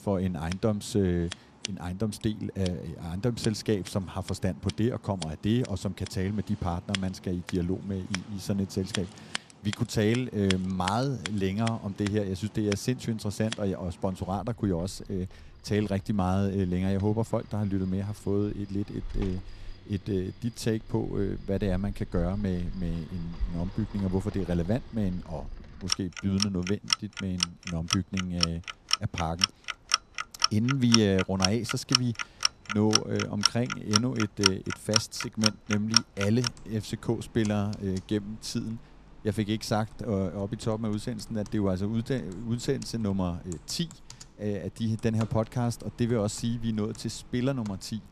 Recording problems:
household noises; loud; throughout; 1 dB below the speech

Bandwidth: 14 kHz